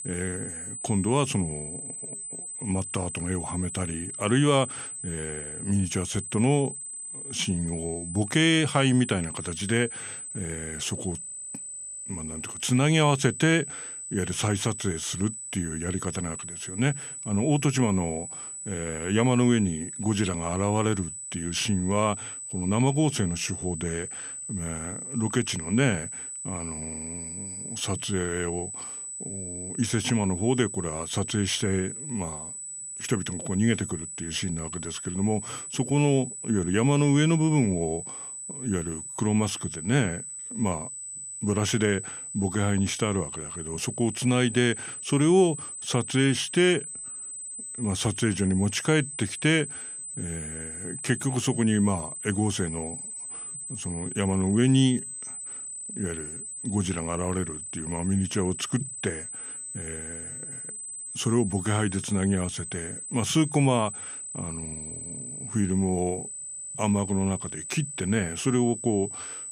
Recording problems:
high-pitched whine; loud; throughout; 8 kHz, 8 dB below the speech

